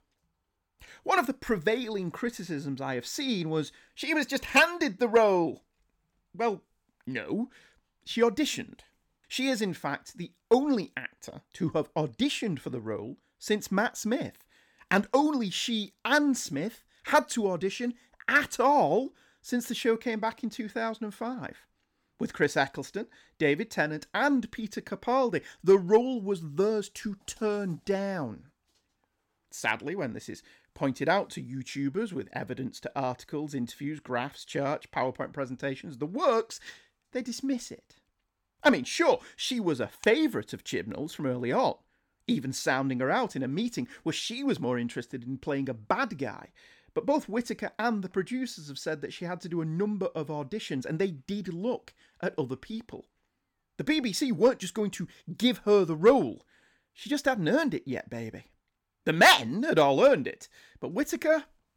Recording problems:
none

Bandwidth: 18 kHz